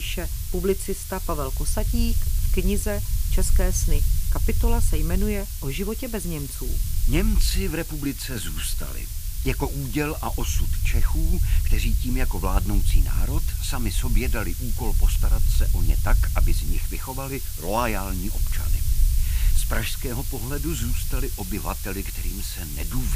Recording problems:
hiss; loud; throughout; 5 dB below the speech
low rumble; noticeable; throughout; 15 dB below the speech
abrupt cut into speech; at the start and the end

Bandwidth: 15 kHz